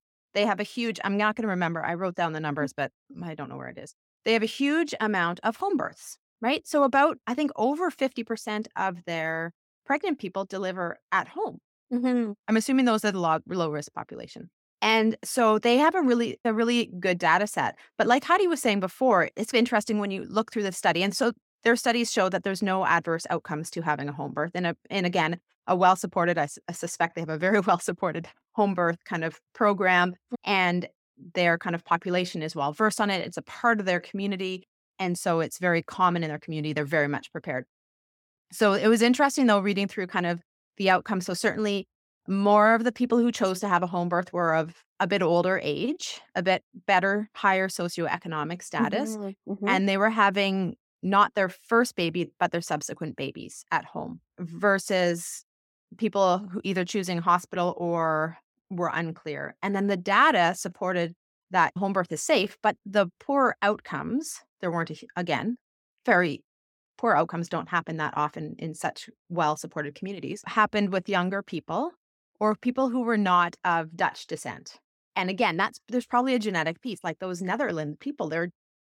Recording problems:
none

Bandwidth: 17 kHz